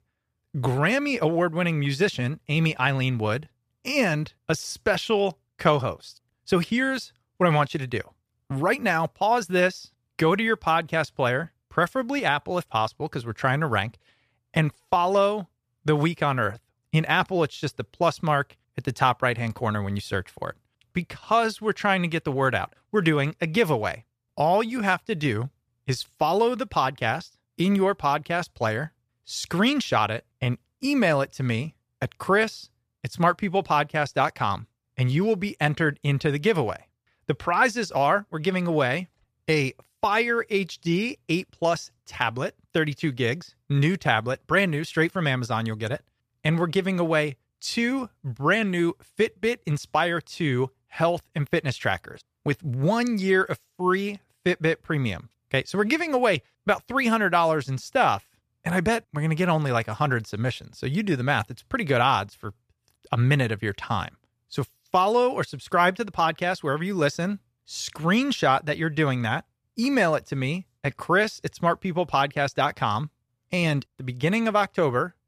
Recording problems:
none

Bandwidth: 14.5 kHz